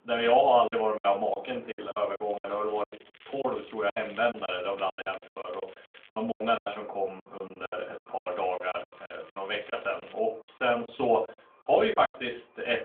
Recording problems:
off-mic speech; far
phone-call audio; nothing above 3 kHz
room echo; very slight; dies away in 0.3 s
traffic noise; faint; throughout; 25 dB below the speech
crackling; faint; from 2 to 6 s and from 8.5 to 10 s; 25 dB below the speech
choppy; very; 16% of the speech affected

